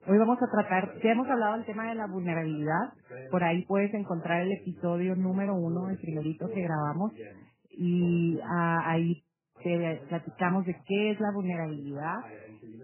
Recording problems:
garbled, watery; badly; nothing above 3 kHz
voice in the background; noticeable; throughout; 15 dB below the speech

